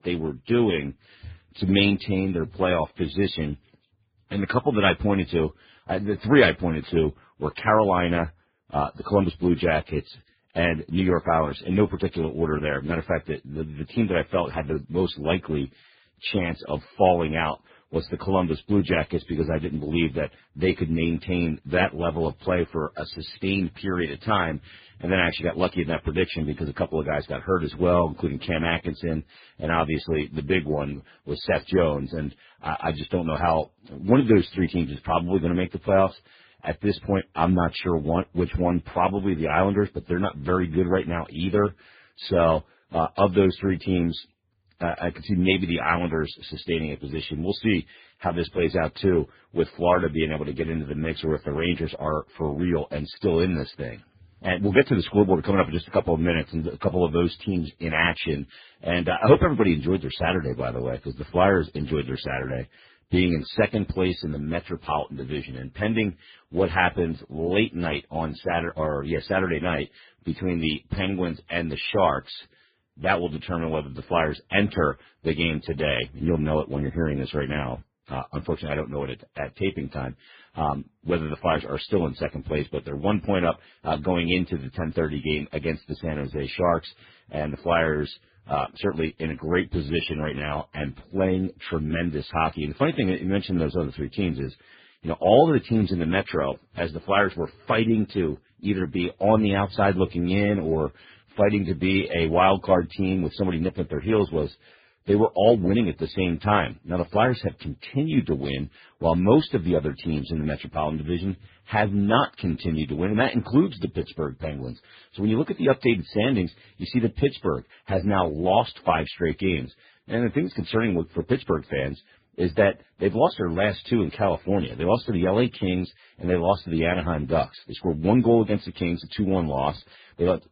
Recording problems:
garbled, watery; badly
high frequencies cut off; severe; nothing above 5 kHz

